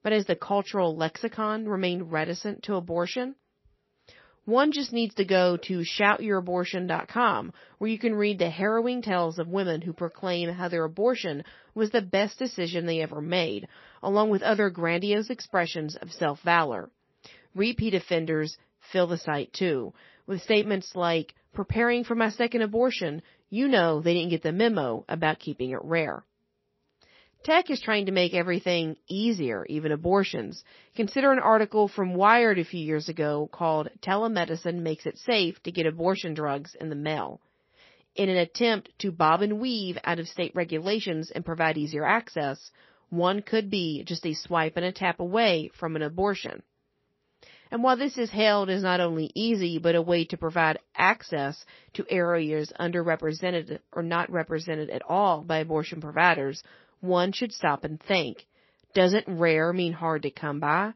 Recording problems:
garbled, watery; slightly; nothing above 5.5 kHz

